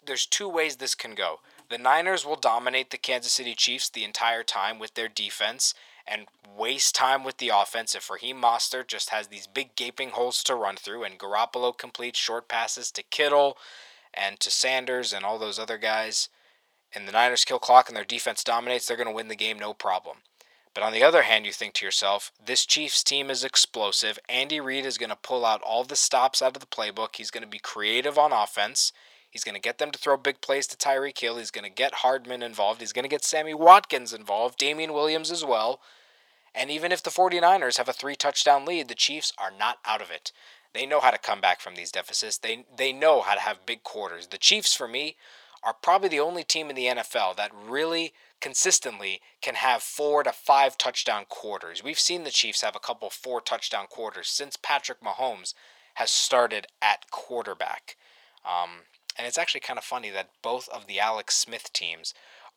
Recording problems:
thin; very; fading below 800 Hz

